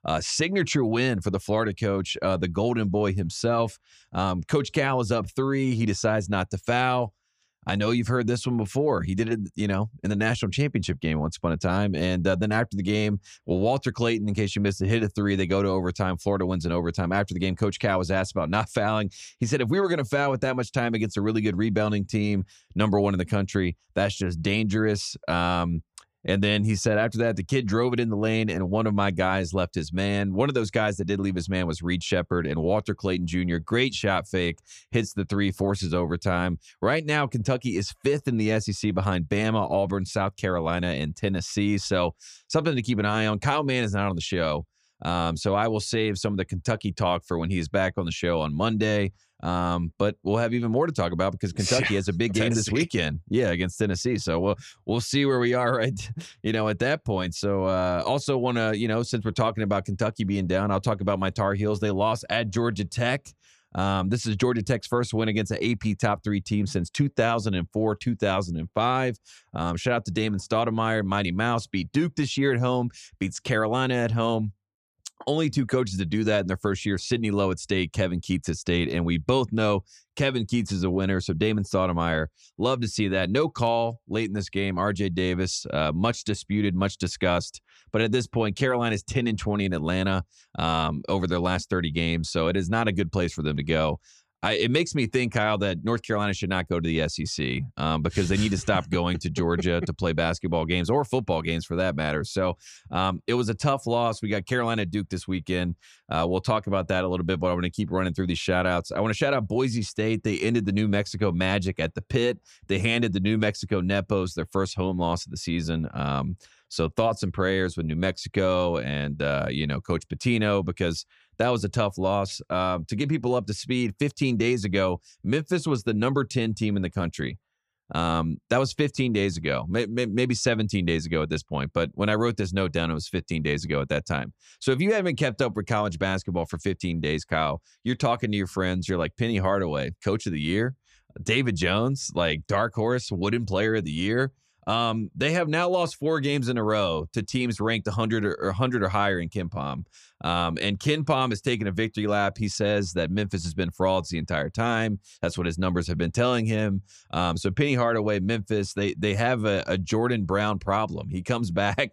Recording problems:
none

